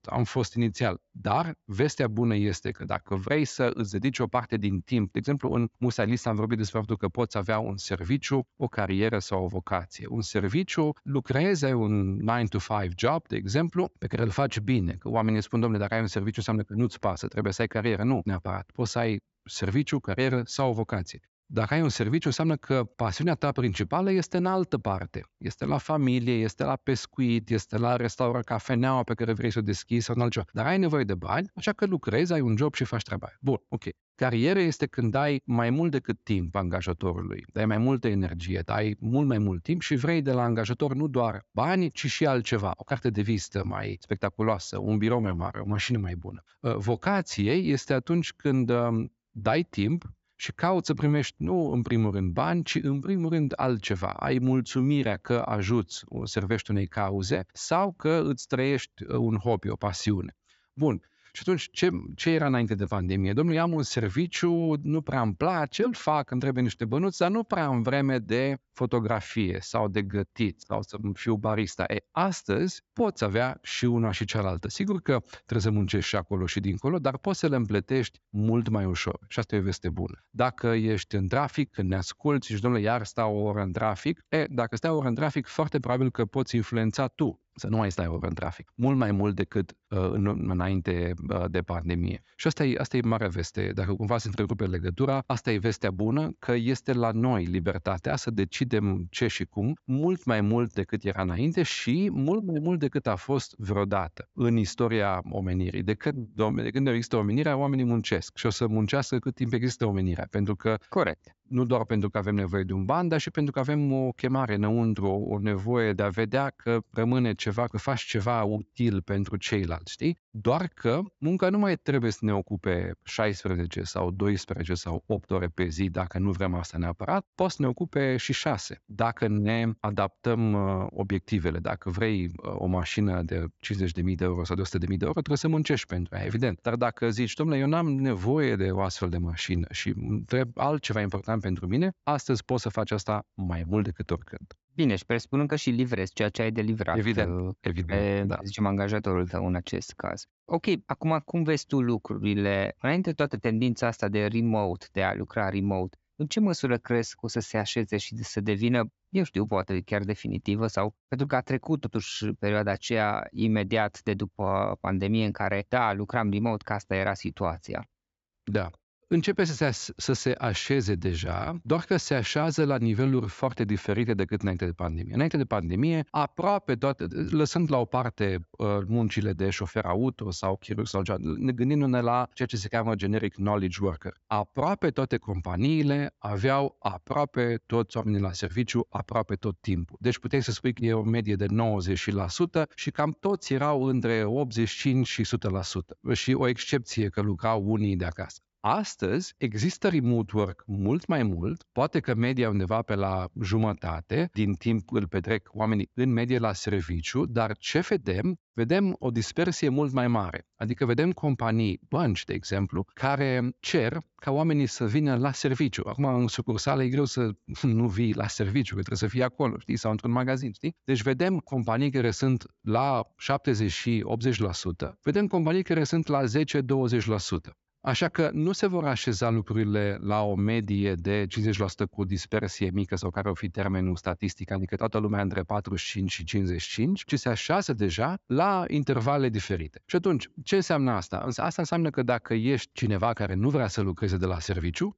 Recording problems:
high frequencies cut off; noticeable; nothing above 8 kHz

